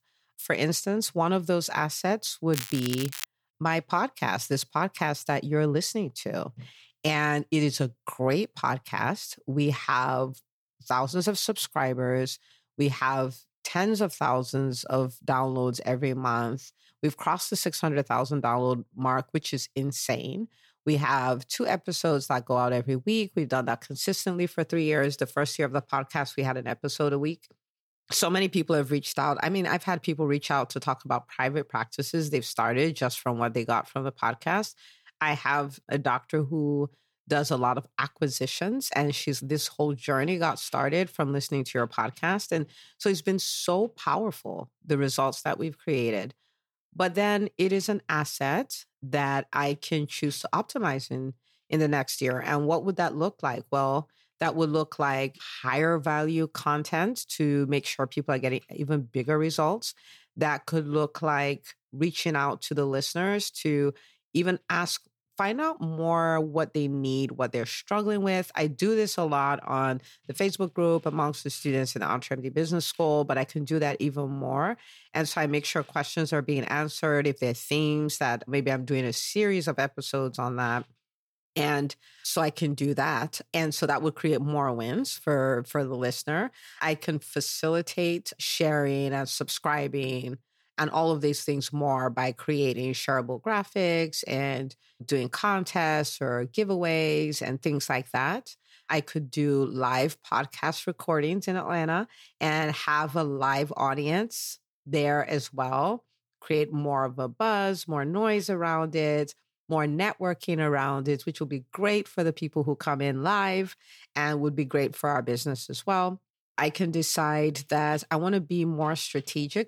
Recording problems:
crackling; loud; at 2.5 s; 9 dB below the speech

